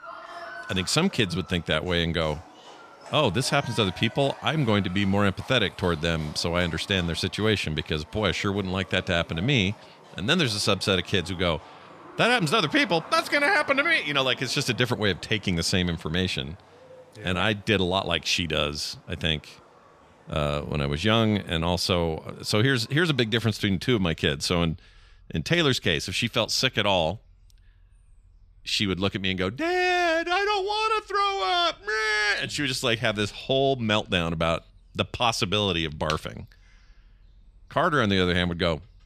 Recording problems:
animal sounds; faint; throughout; 20 dB below the speech

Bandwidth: 14 kHz